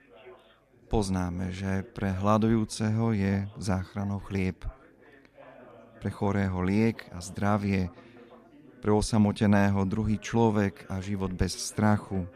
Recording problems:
background chatter; faint; throughout; 3 voices, 25 dB below the speech

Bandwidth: 14 kHz